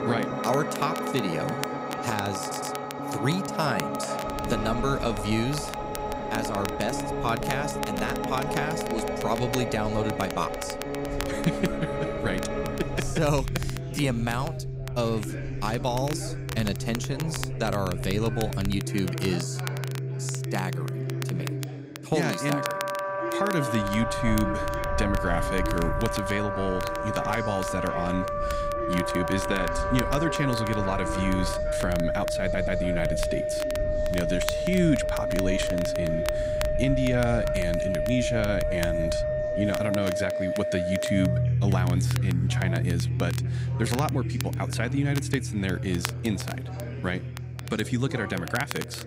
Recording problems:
background music; loud; throughout; 1 dB below the speech
chatter from many people; noticeable; throughout; 10 dB below the speech
crackle, like an old record; noticeable; 10 dB below the speech
low rumble; faint; from 4.5 to 19 s and from 24 to 40 s; 25 dB below the speech
audio stuttering; at 2.5 s and at 32 s

